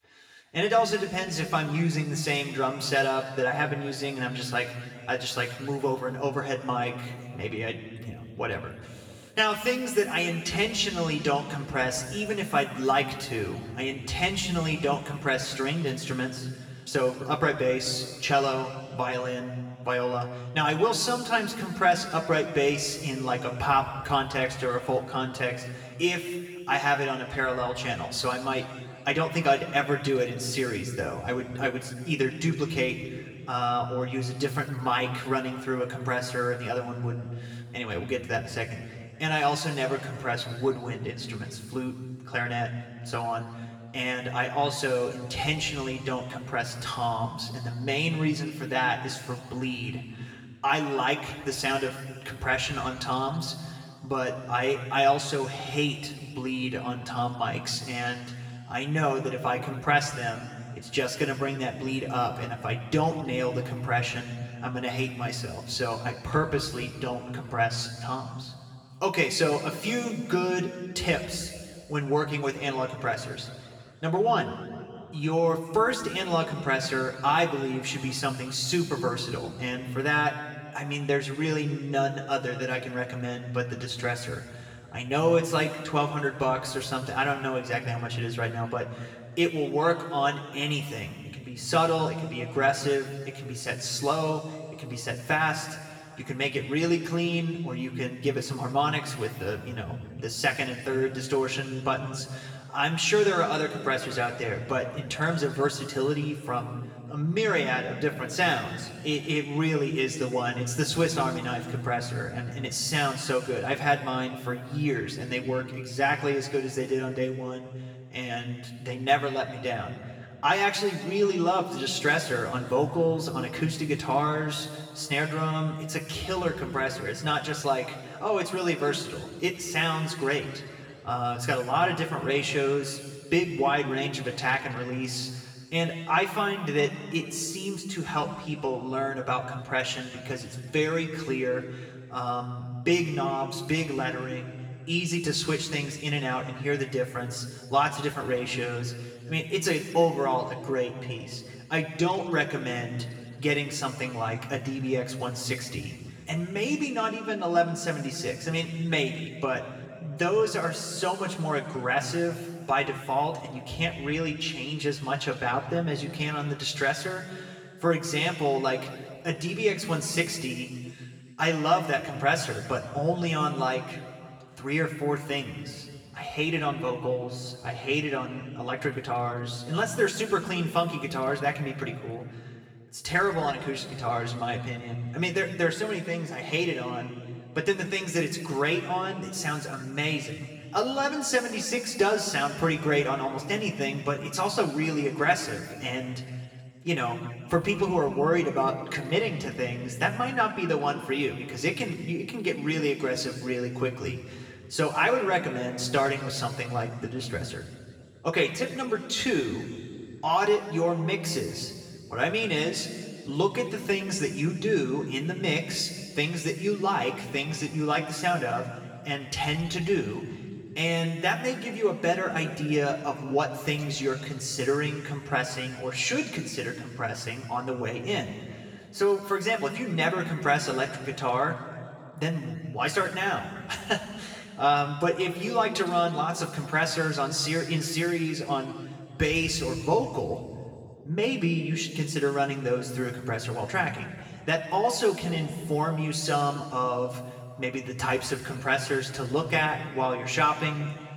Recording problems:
room echo; noticeable; dies away in 1.8 s
off-mic speech; somewhat distant

